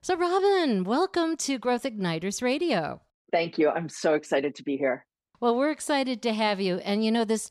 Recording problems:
none

